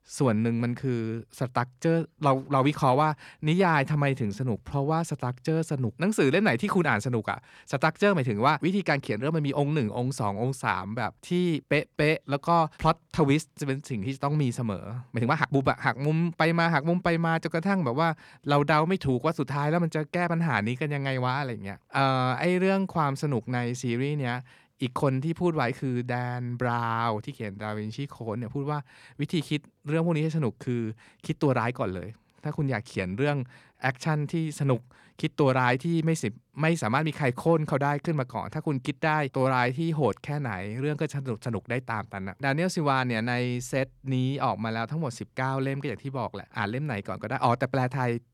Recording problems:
uneven, jittery; strongly; from 3.5 to 40 s

